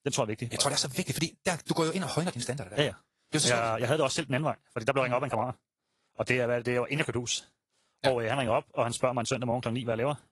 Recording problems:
wrong speed, natural pitch; too fast; 1.6 times normal speed
garbled, watery; slightly; nothing above 11 kHz

